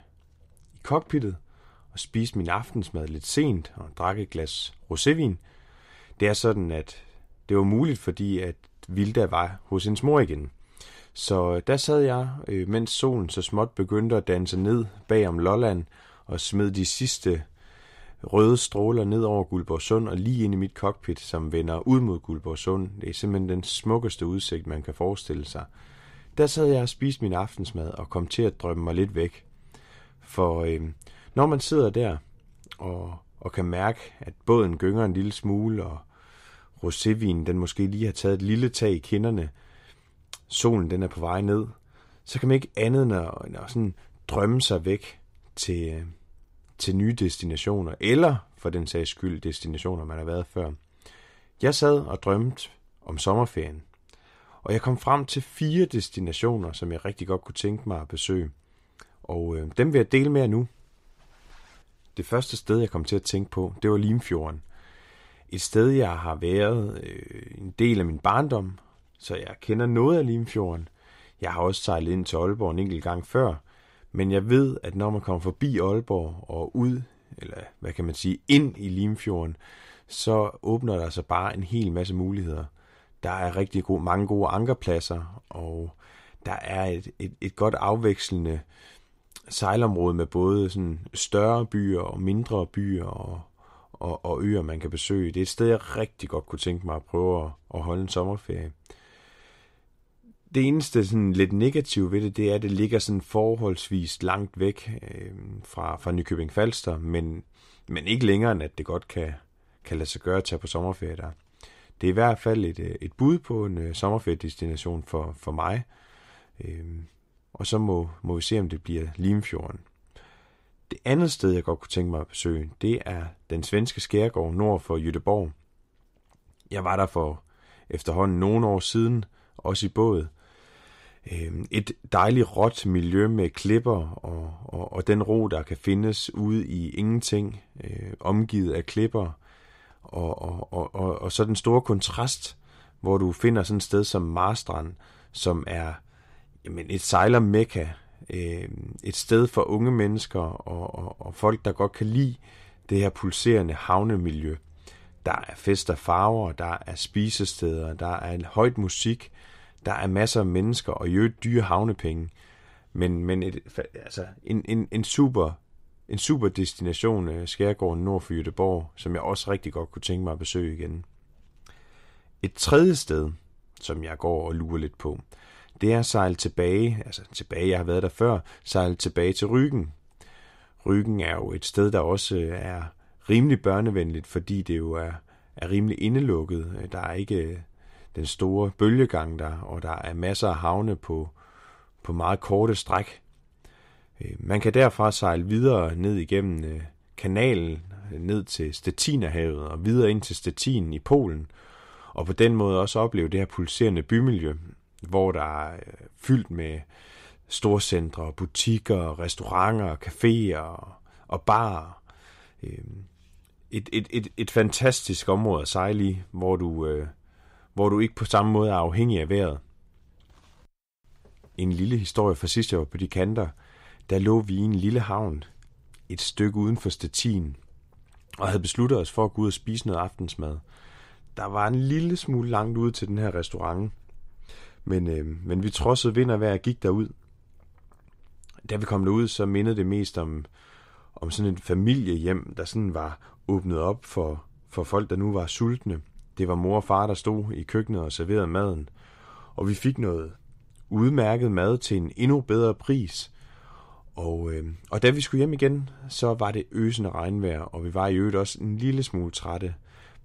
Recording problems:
none

